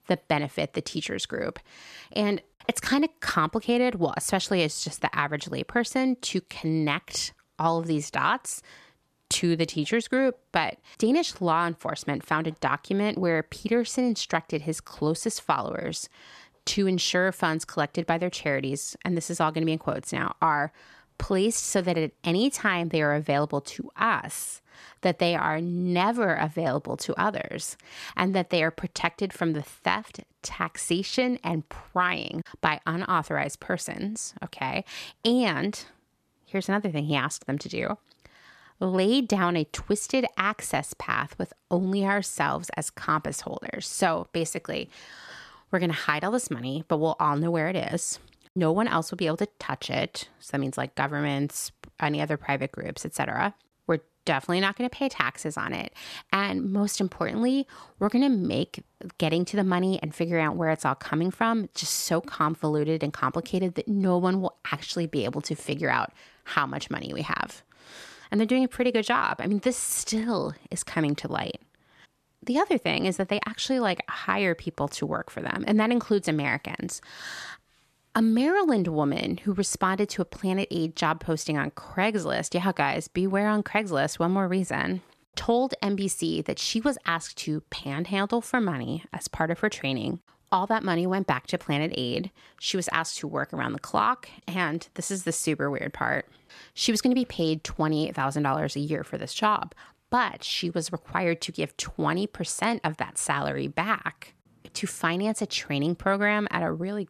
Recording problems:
none

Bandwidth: 13.5 kHz